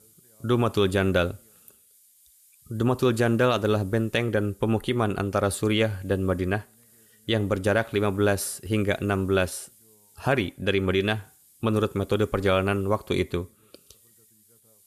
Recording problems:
hiss; faint; throughout; 30 dB below the speech

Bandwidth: 14.5 kHz